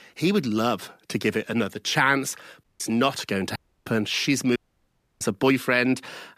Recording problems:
audio cutting out; at 2.5 s, at 3.5 s and at 4.5 s for 0.5 s

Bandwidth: 14.5 kHz